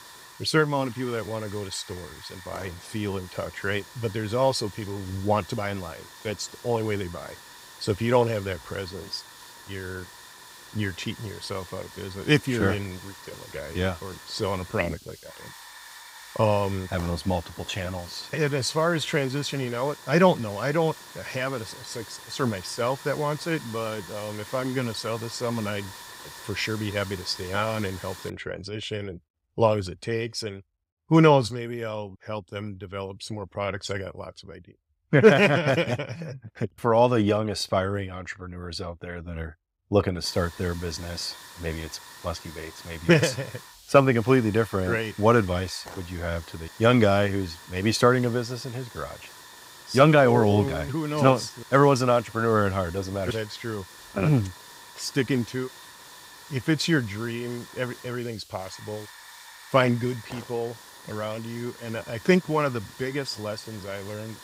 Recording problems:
hiss; noticeable; until 28 s and from 40 s on; 15 dB below the speech

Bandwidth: 15.5 kHz